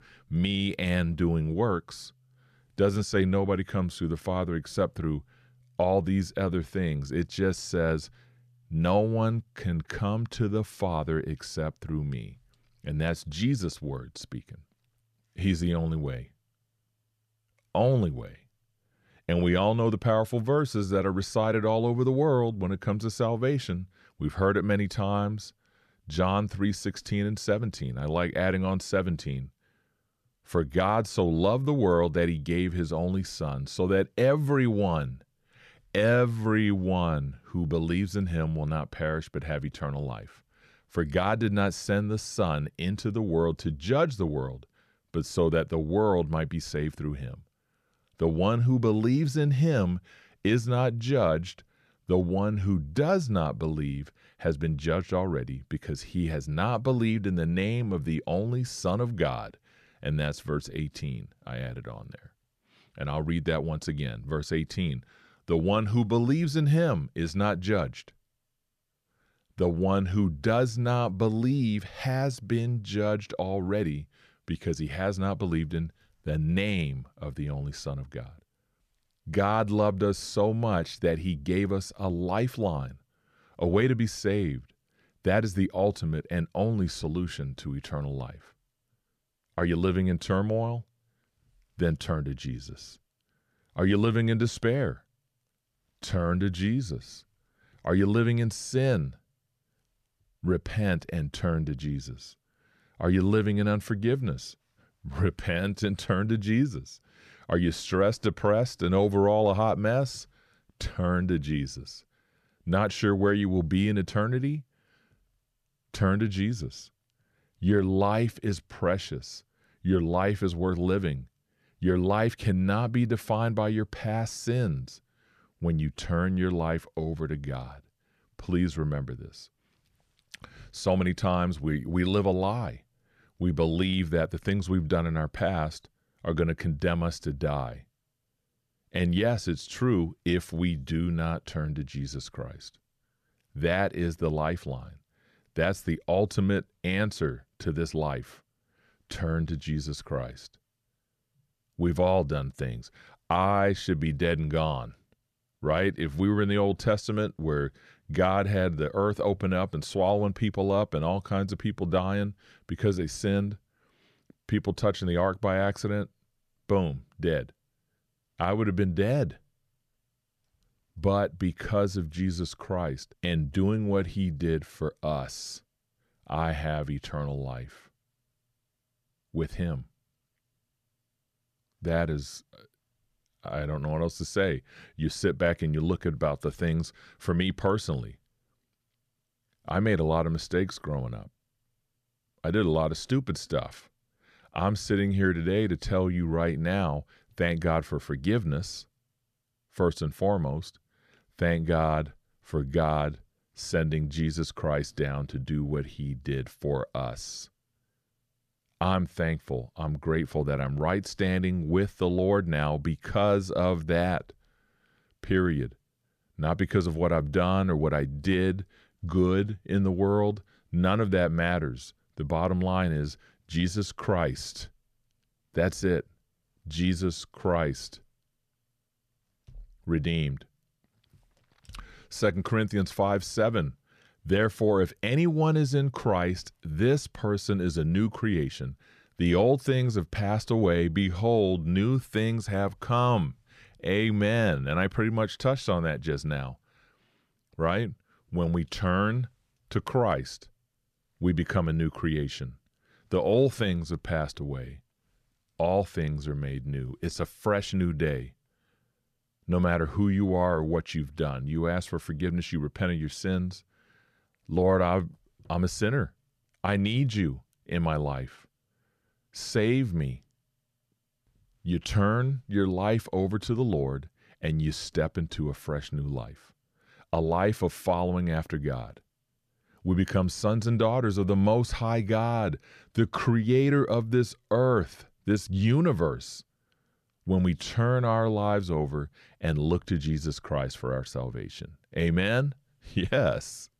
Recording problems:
none

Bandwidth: 14.5 kHz